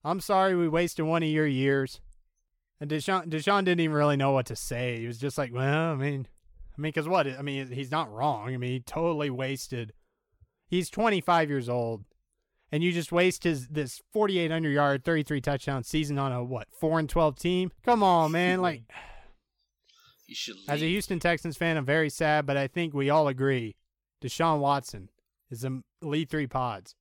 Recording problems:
none

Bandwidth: 17 kHz